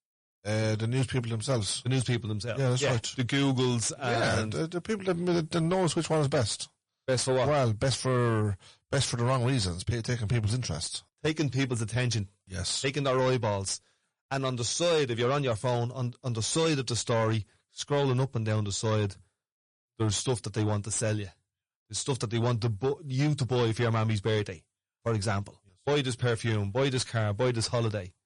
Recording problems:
distortion; slight; 10 dB below the speech
garbled, watery; slightly; nothing above 10 kHz

